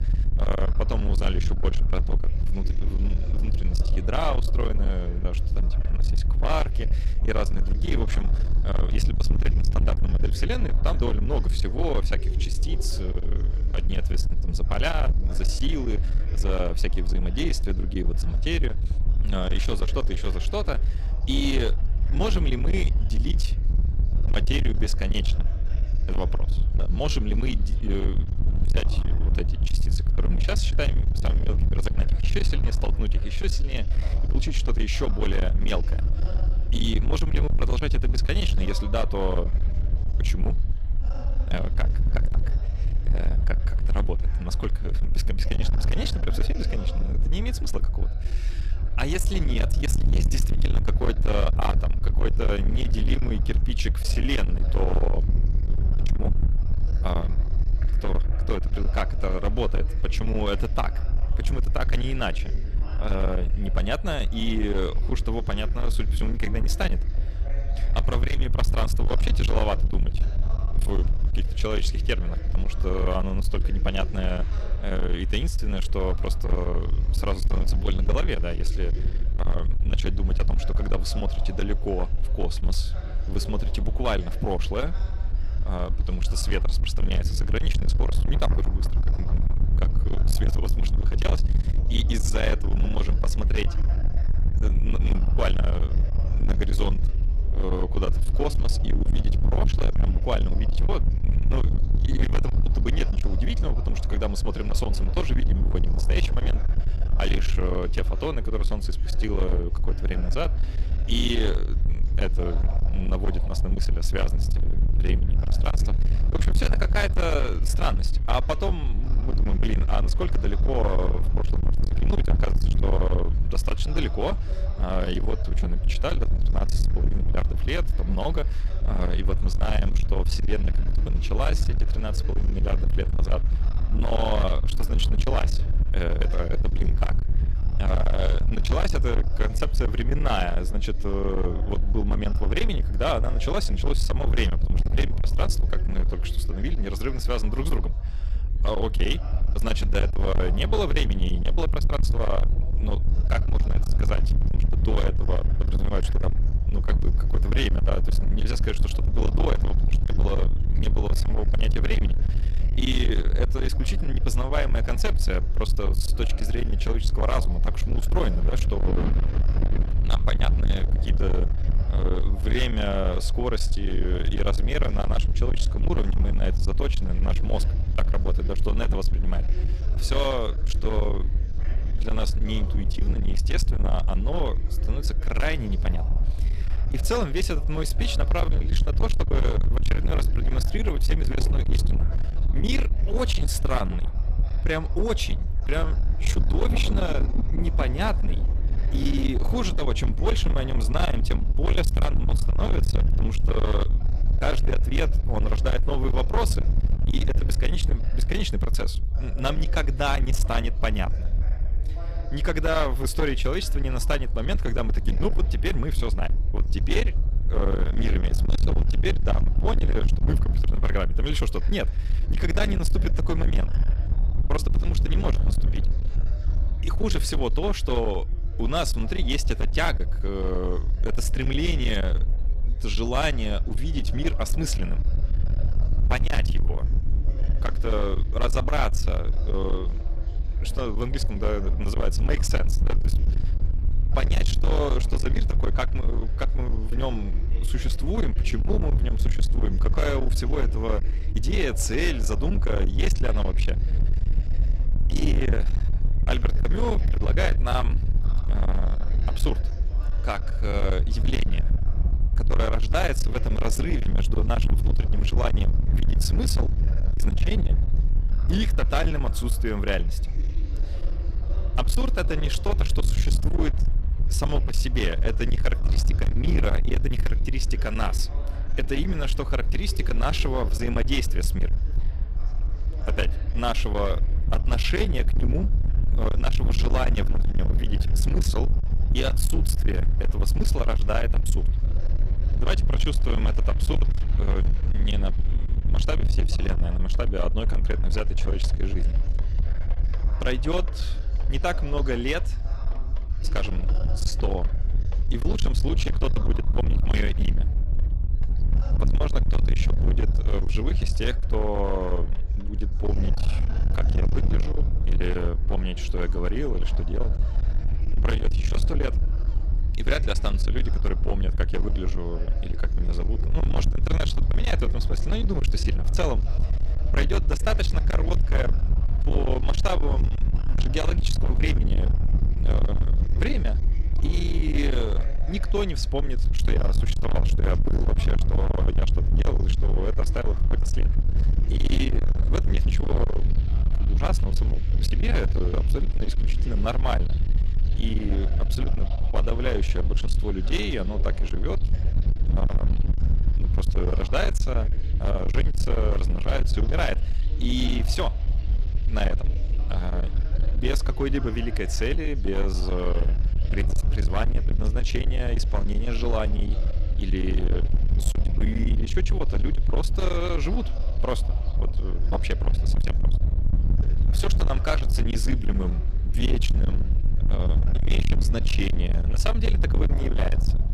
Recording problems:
distortion; heavy; 31% of the sound clipped
low rumble; loud; throughout; 8 dB below the speech
rain or running water; noticeable; throughout; 20 dB below the speech
chatter from many people; noticeable; throughout; 15 dB below the speech

